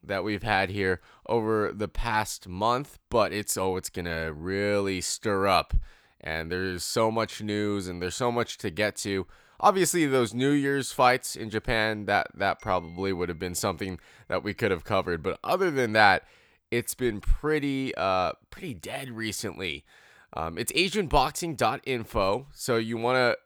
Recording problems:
none

